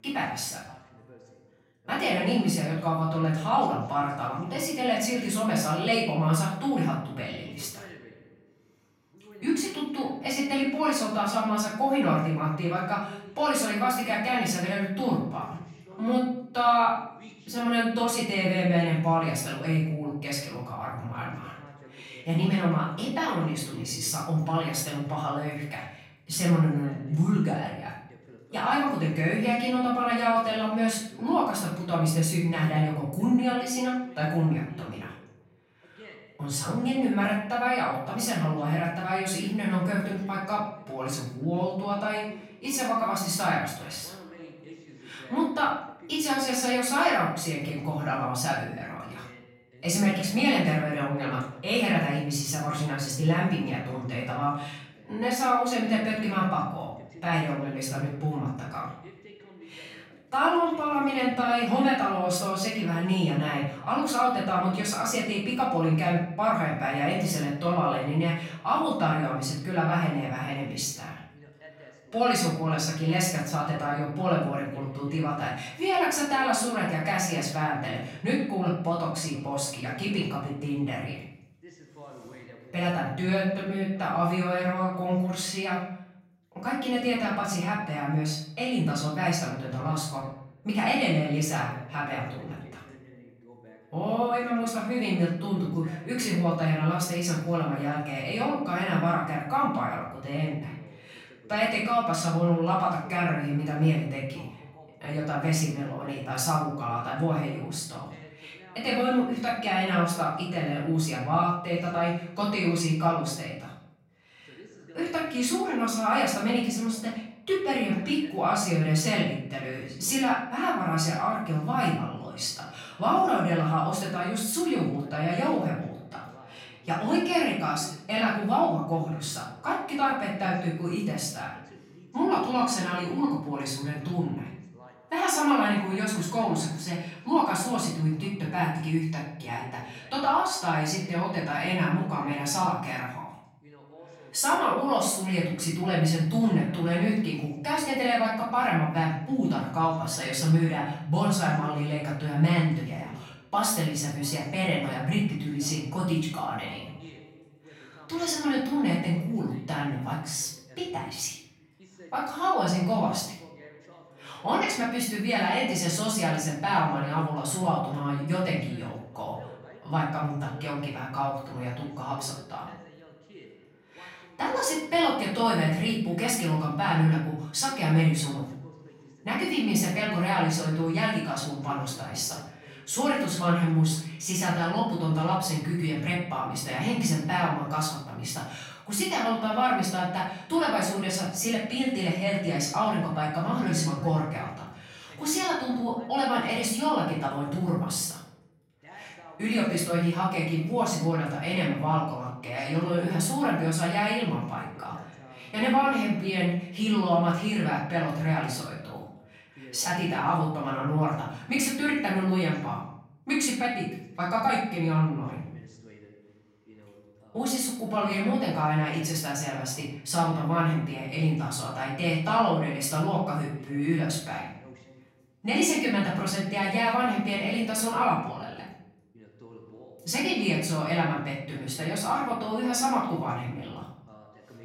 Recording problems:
off-mic speech; far
room echo; noticeable; dies away in 0.6 s
voice in the background; faint; throughout; 25 dB below the speech

